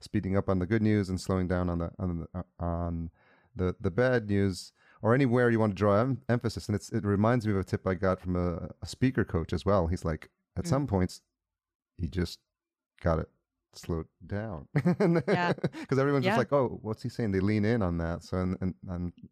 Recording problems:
uneven, jittery; strongly; from 2.5 to 18 s

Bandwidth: 14.5 kHz